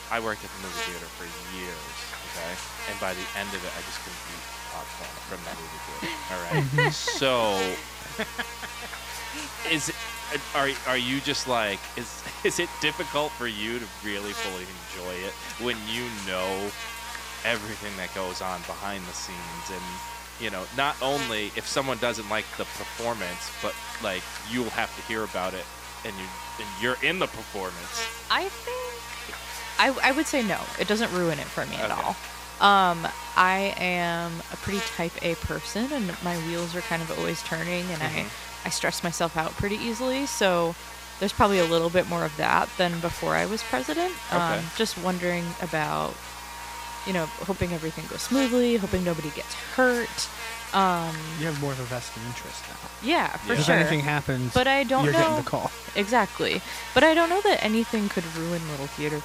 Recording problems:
electrical hum; loud; throughout; 60 Hz, 9 dB below the speech

